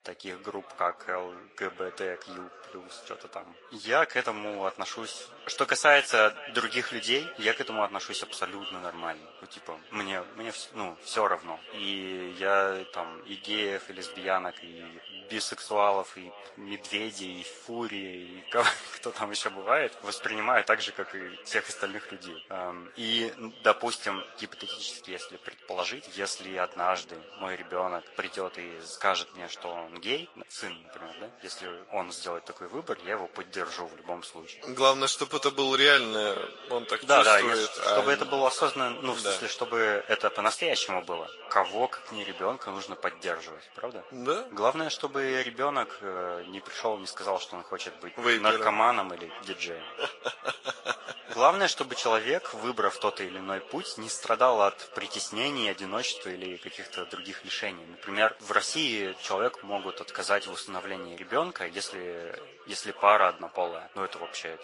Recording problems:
thin; very; fading below 650 Hz
echo of what is said; noticeable; throughout; 510 ms later, 15 dB below the speech
garbled, watery; slightly; nothing above 10.5 kHz
background chatter; faint; throughout; 4 voices, 25 dB below the speech

